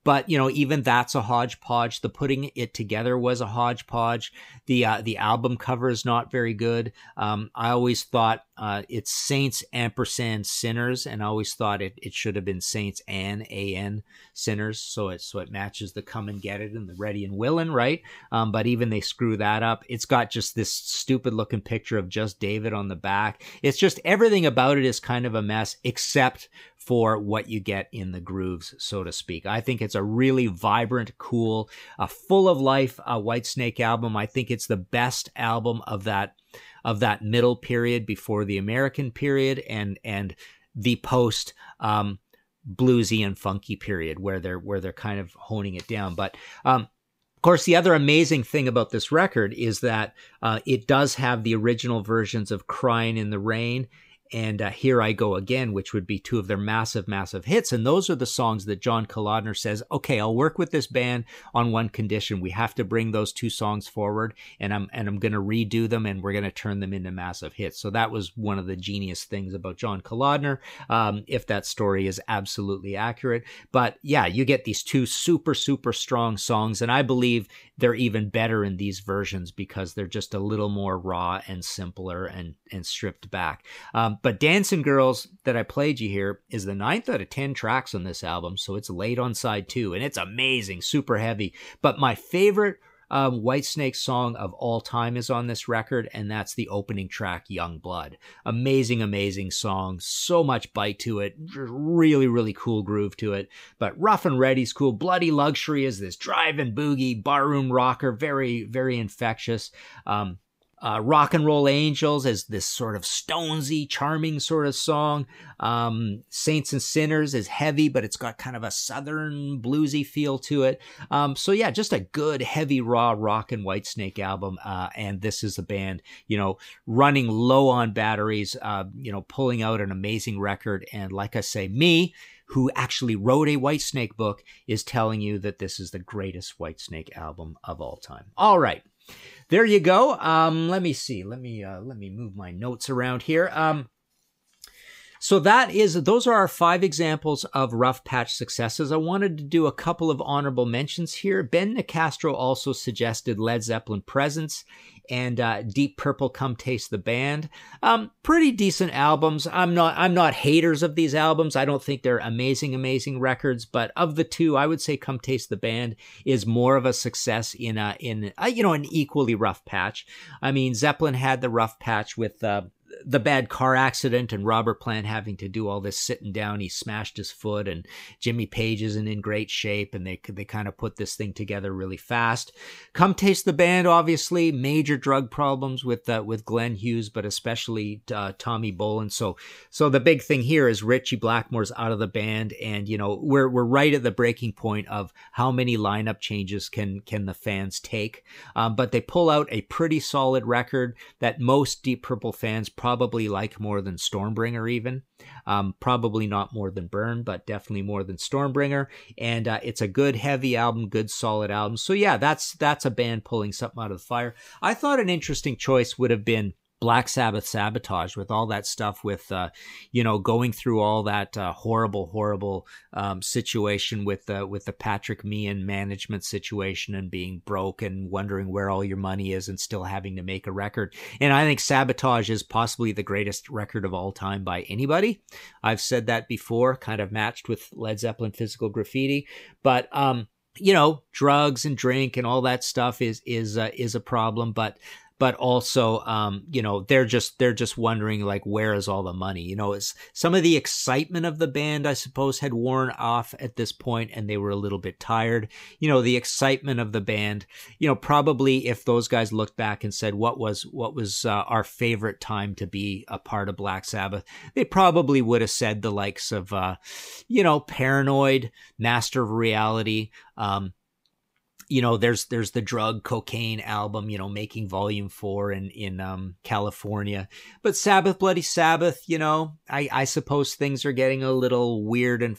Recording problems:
none

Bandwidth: 15.5 kHz